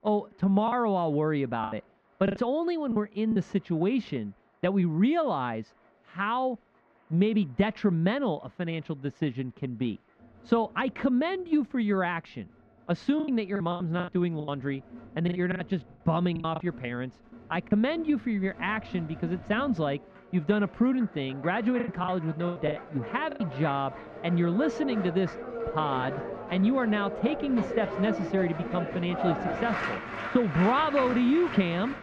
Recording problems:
muffled; very; fading above 2 kHz
crowd noise; loud; throughout; 8 dB below the speech
choppy; very; from 0.5 to 3.5 s, from 13 to 18 s and from 22 to 23 s; 15% of the speech affected

